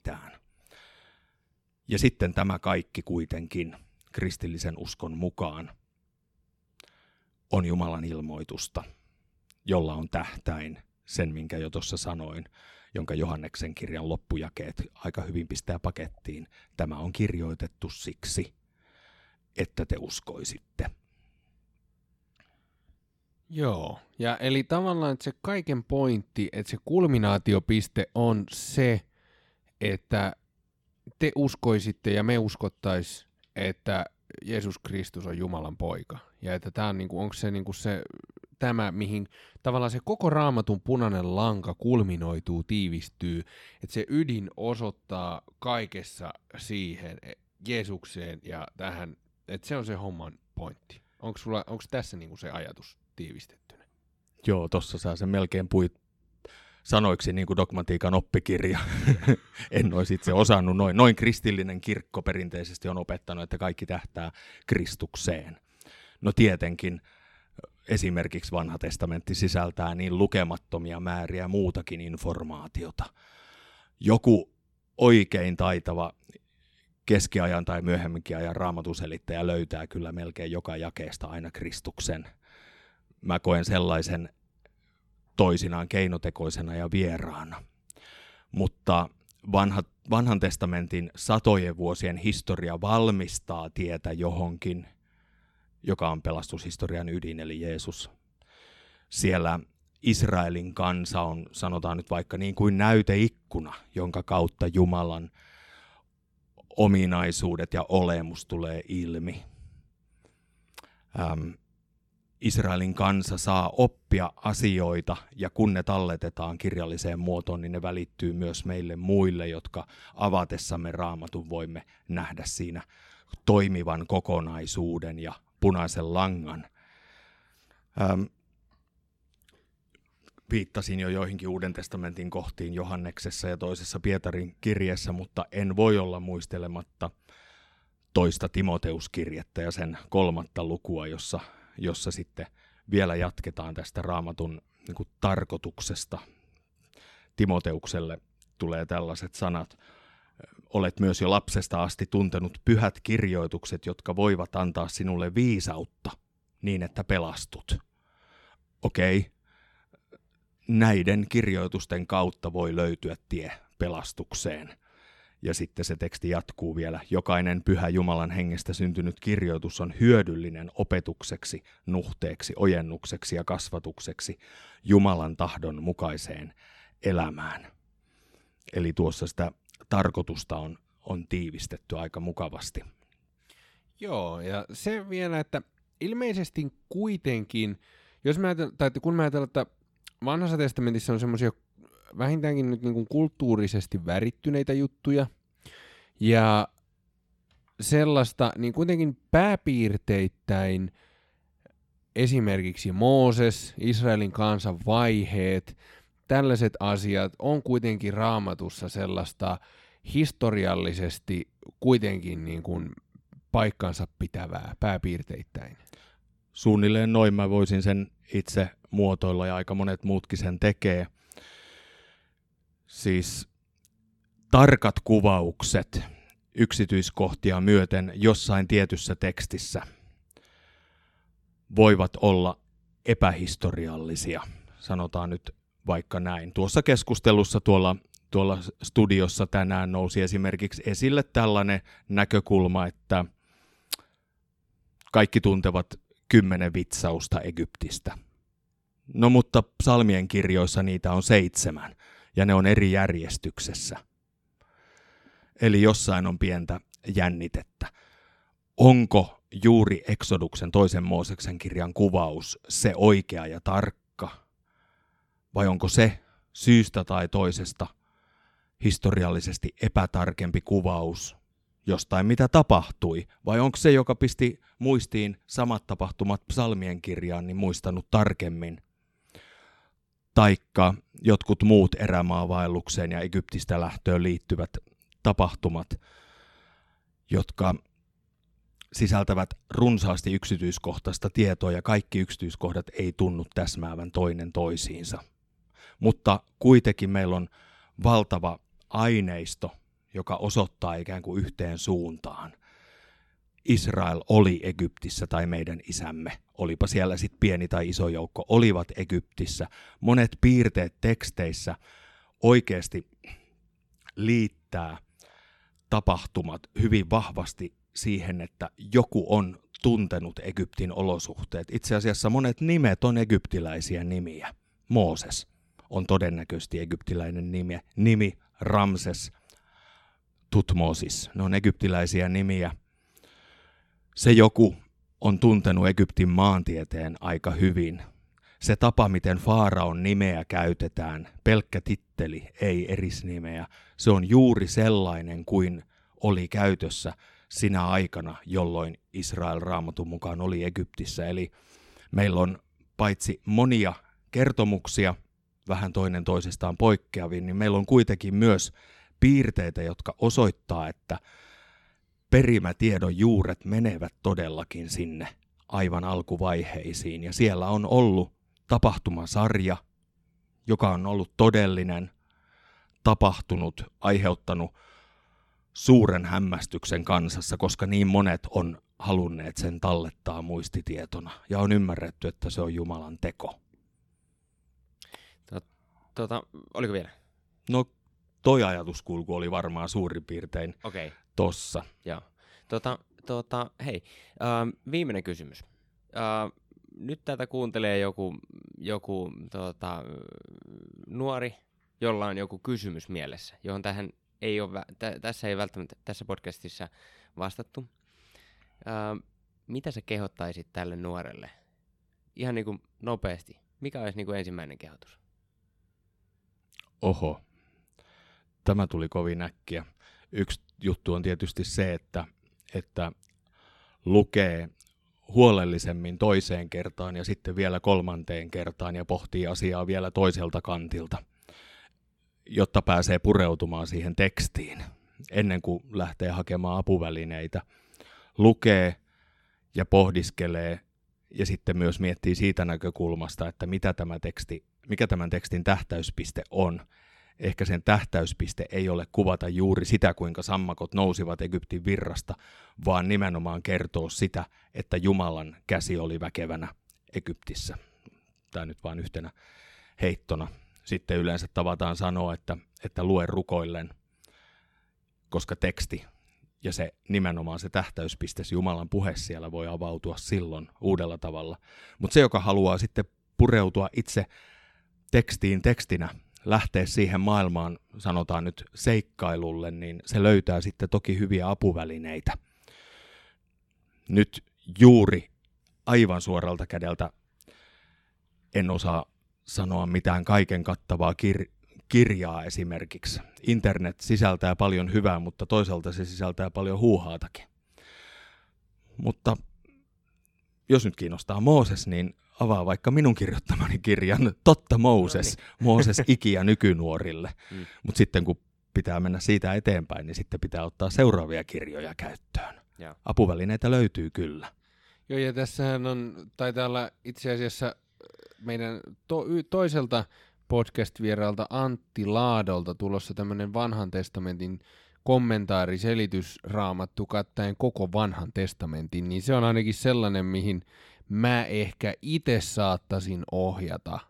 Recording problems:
none

